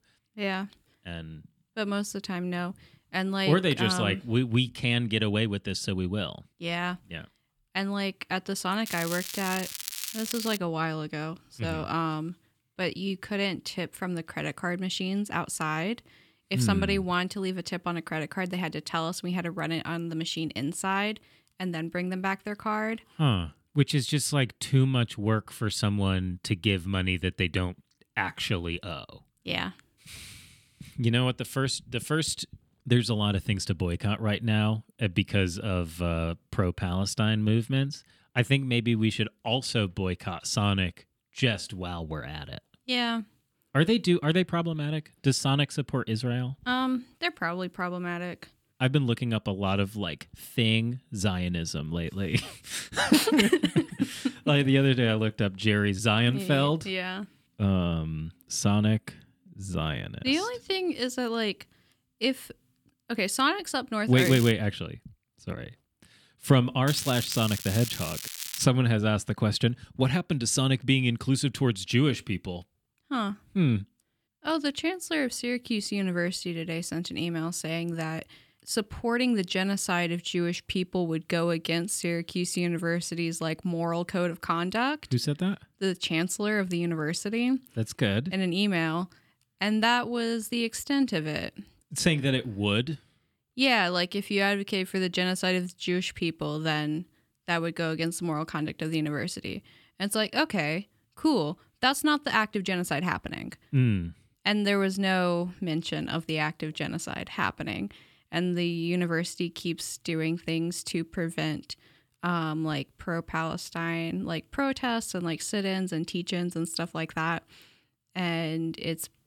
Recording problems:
crackling; loud; from 9 to 11 s, at 1:04 and from 1:07 to 1:09; 7 dB below the speech

